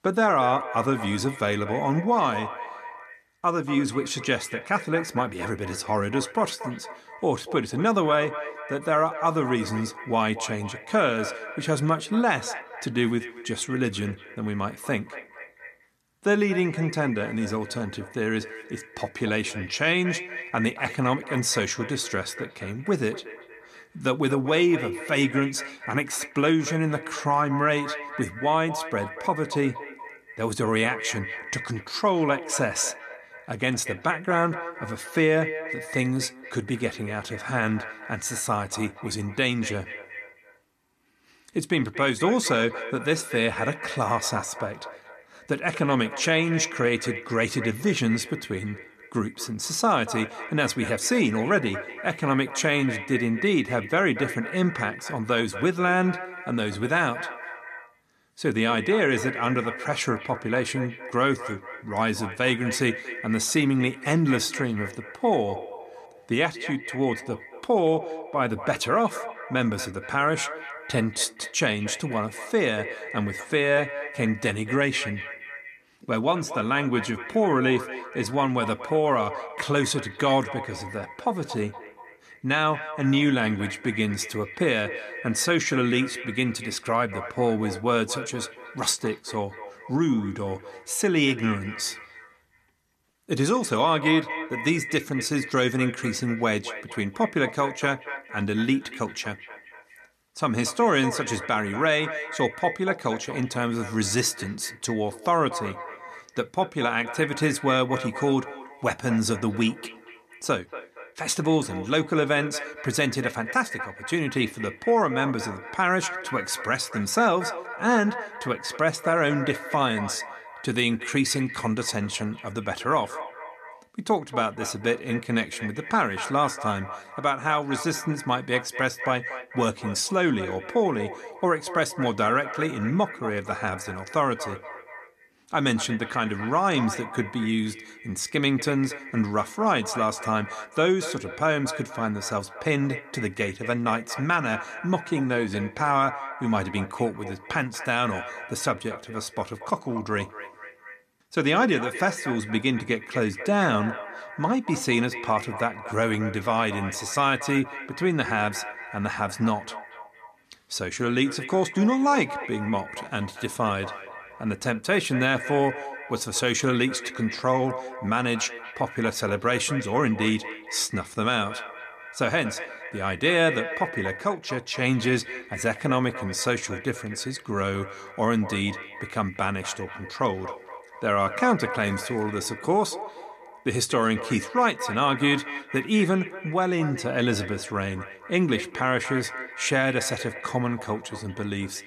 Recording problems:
echo of what is said; strong; throughout; 230 ms later, 10 dB below the speech

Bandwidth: 14 kHz